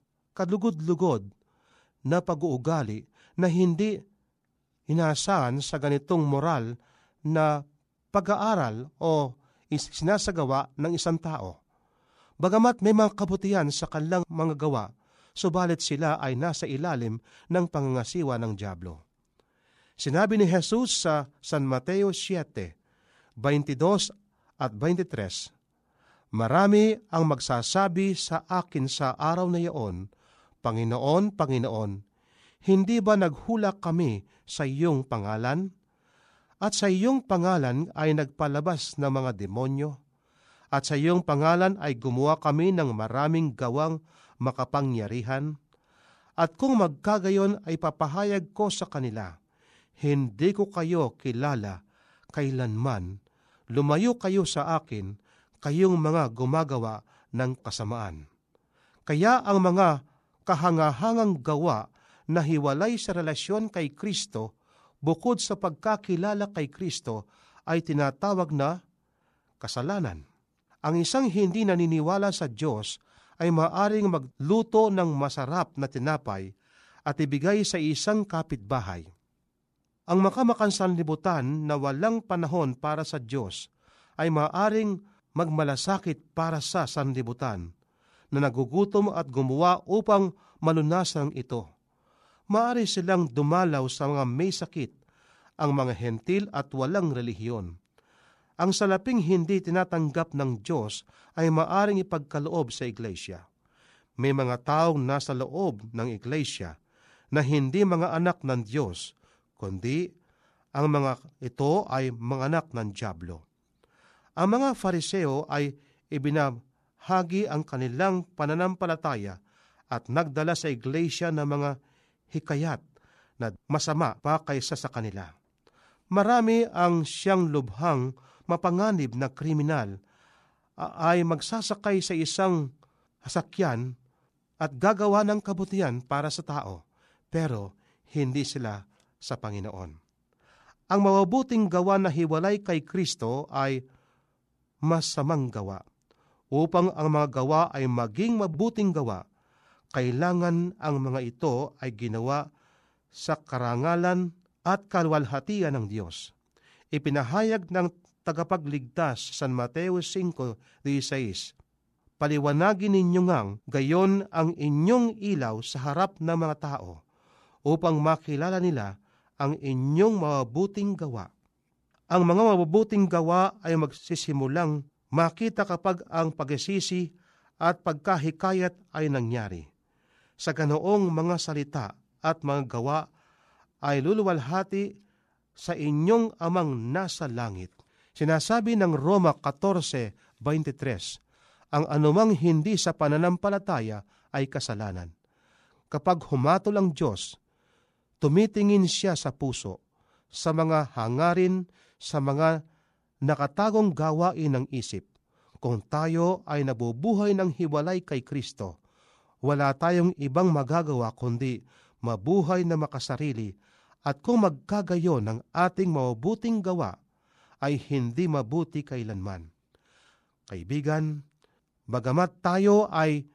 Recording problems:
none

